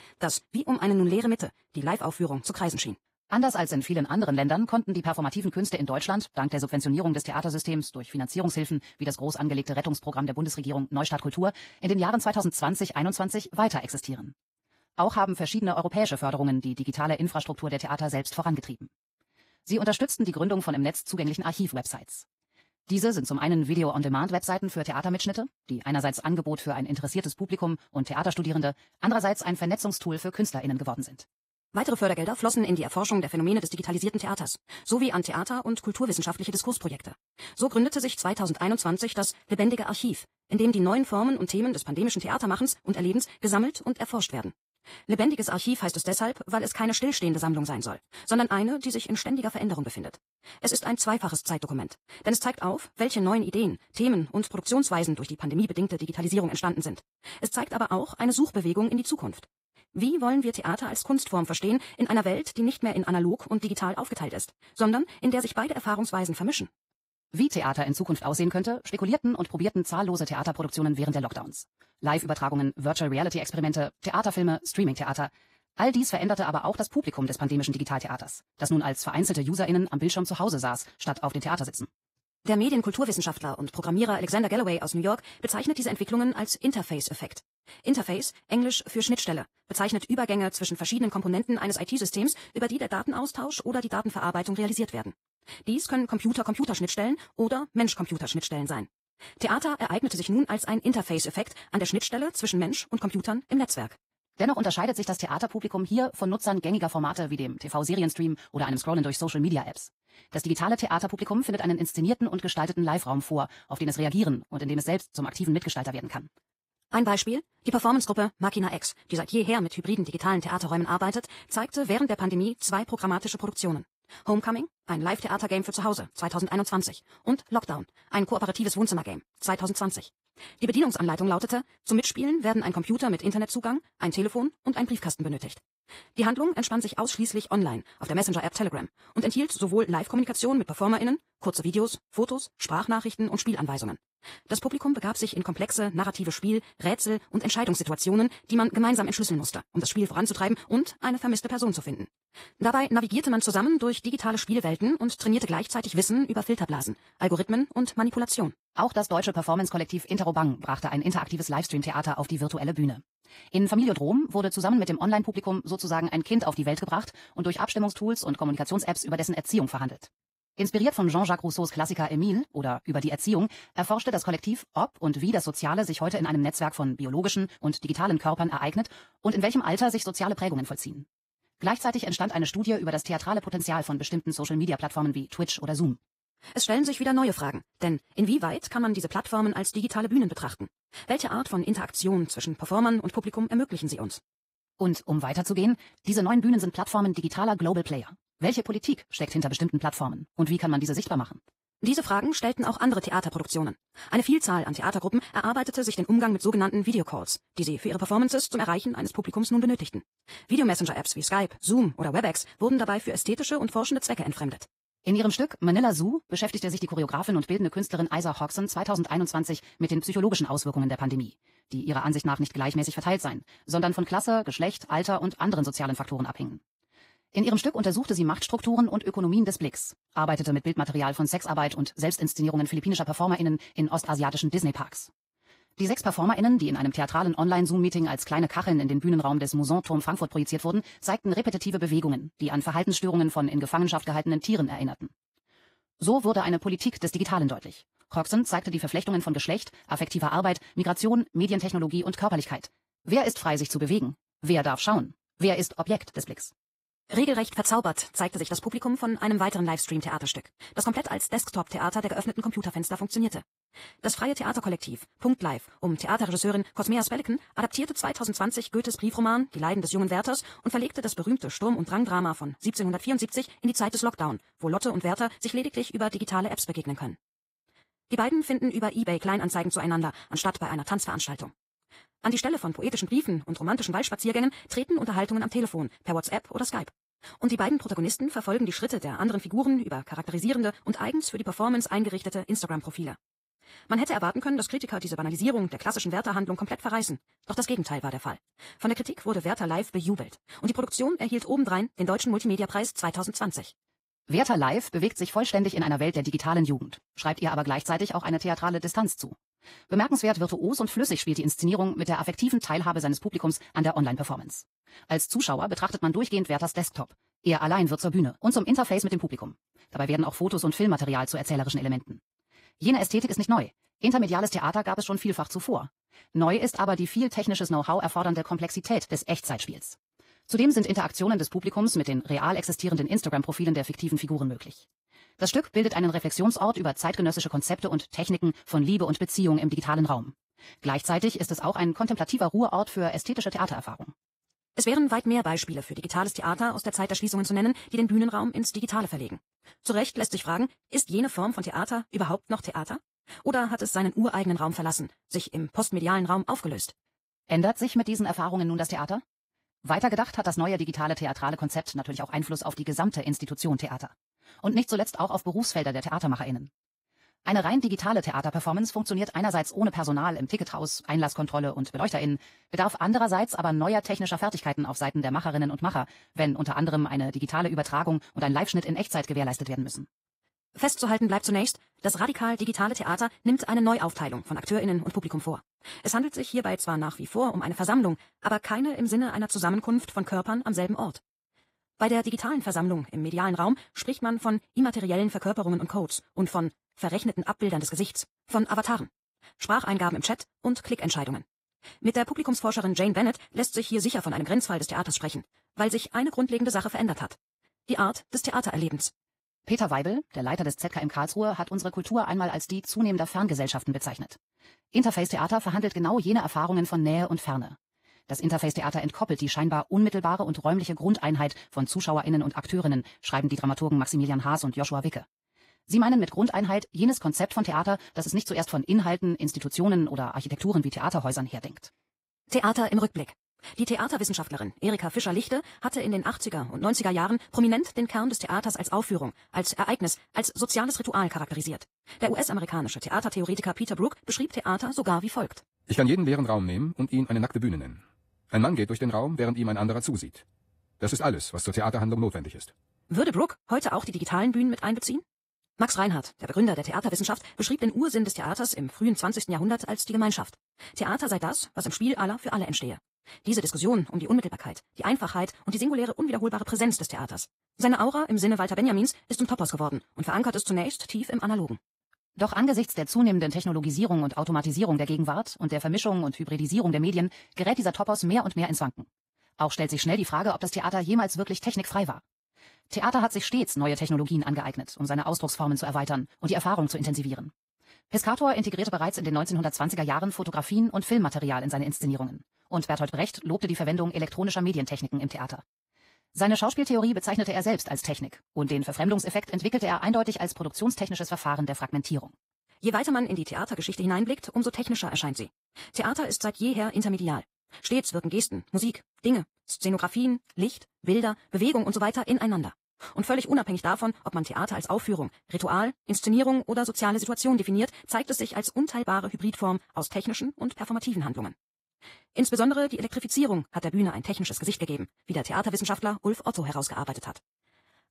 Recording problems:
wrong speed, natural pitch; too fast; 1.6 times normal speed
garbled, watery; slightly; nothing above 15.5 kHz

